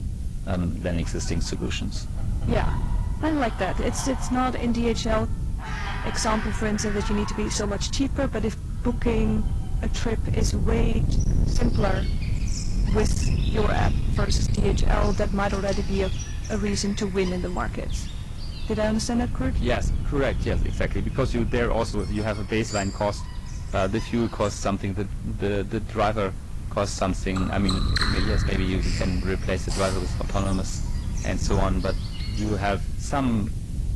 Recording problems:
distortion; slight; 10% of the sound clipped
garbled, watery; slightly; nothing above 11.5 kHz
animal sounds; noticeable; throughout; 10 dB below the speech
wind noise on the microphone; occasional gusts; 10 dB below the speech
hiss; faint; throughout; 25 dB below the speech

